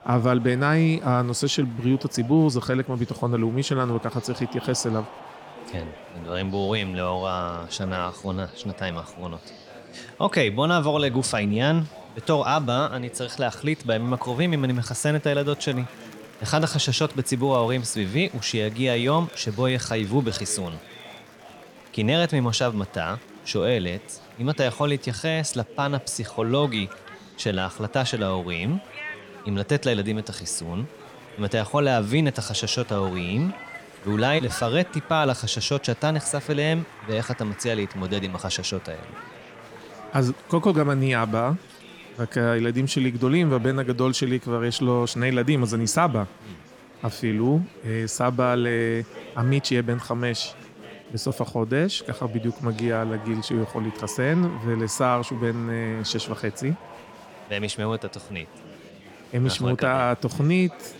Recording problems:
murmuring crowd; noticeable; throughout; 20 dB below the speech

